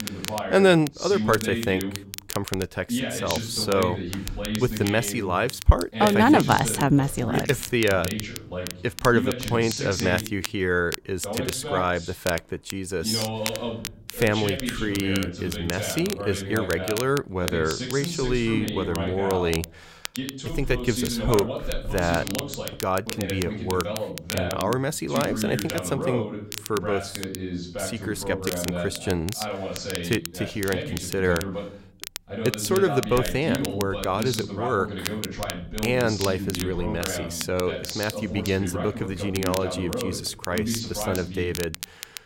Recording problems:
voice in the background; loud; throughout; 6 dB below the speech
crackle, like an old record; noticeable; 10 dB below the speech

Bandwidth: 16 kHz